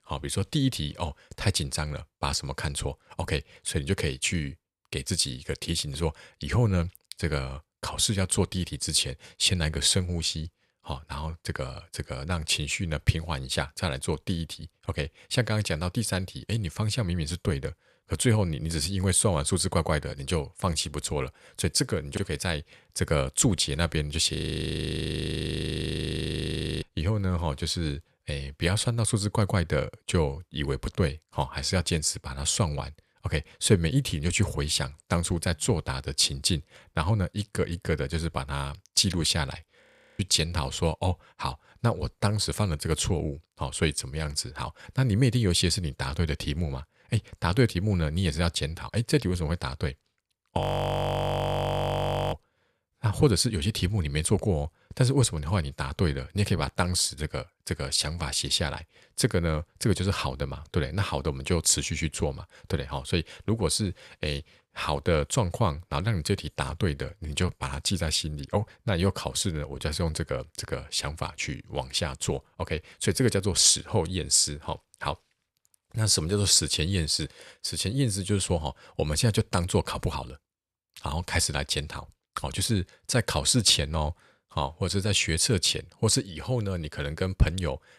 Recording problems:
audio freezing; at 24 s for 2.5 s, at 40 s and at 51 s for 1.5 s

